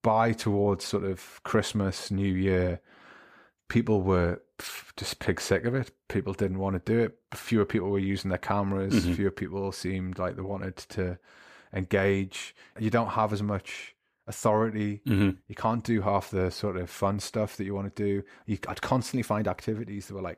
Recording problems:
none

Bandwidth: 14.5 kHz